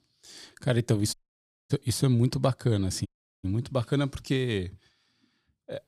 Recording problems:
audio cutting out; at 1 s for 0.5 s and at 3 s

